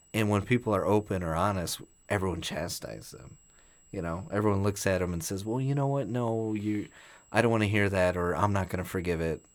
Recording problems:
high-pitched whine; faint; throughout; 7.5 kHz, 30 dB below the speech

